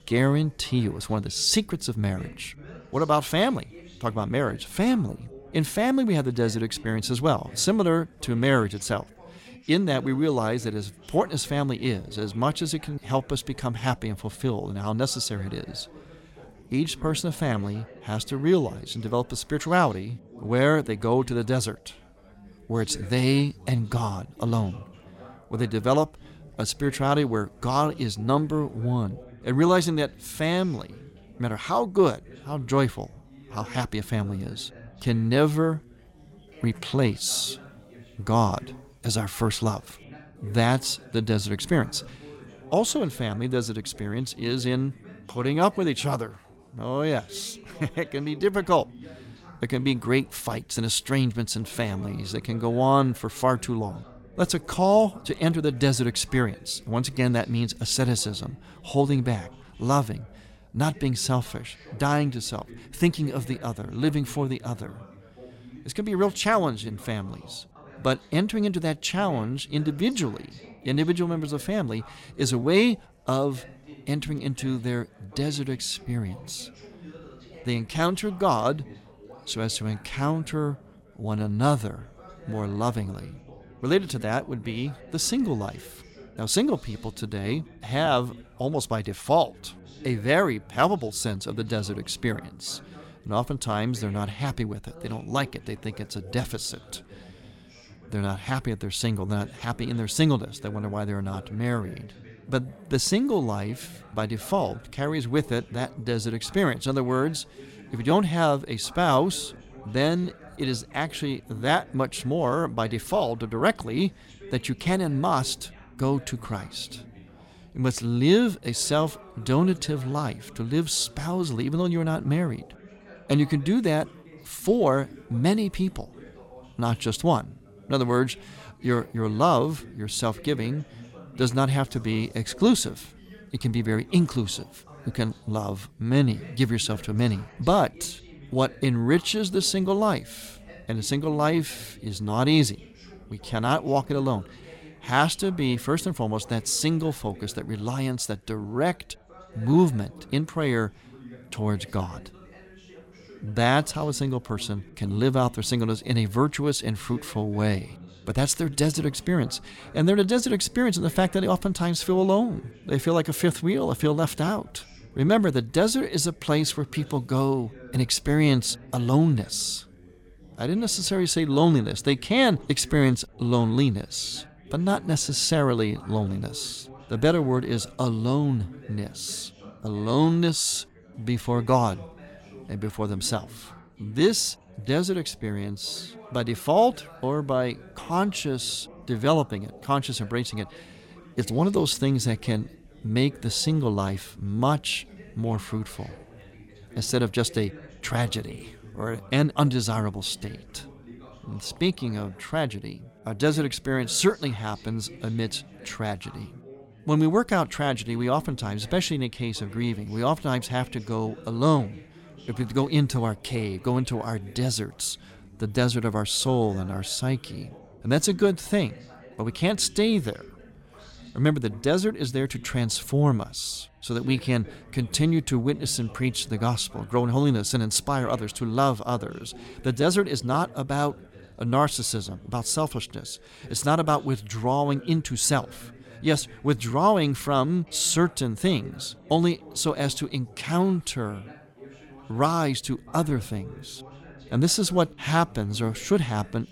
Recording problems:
background chatter; faint; throughout; 4 voices, 20 dB below the speech

